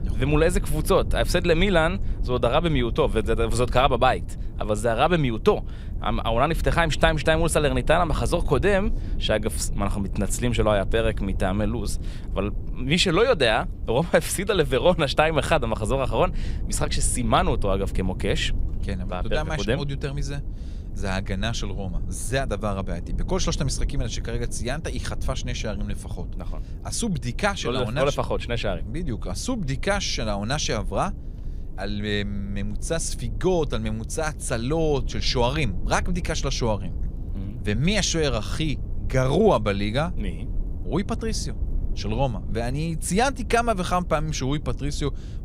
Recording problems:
low rumble; faint; throughout; 20 dB below the speech

